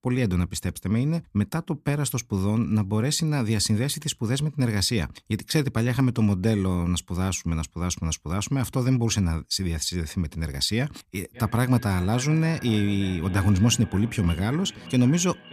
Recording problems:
echo of what is said; noticeable; from 11 s on; 580 ms later, 15 dB below the speech

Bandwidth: 14.5 kHz